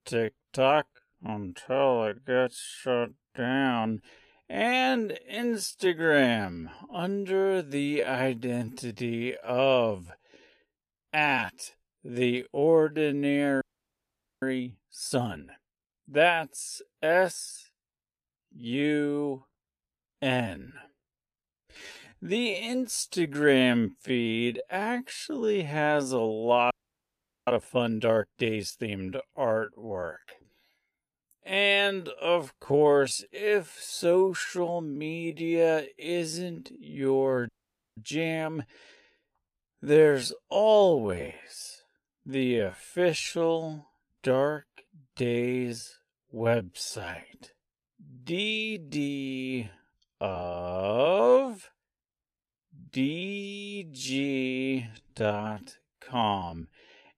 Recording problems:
wrong speed, natural pitch; too slow; 0.6 times normal speed
audio freezing; at 14 s for 1 s, at 27 s for 1 s and at 37 s

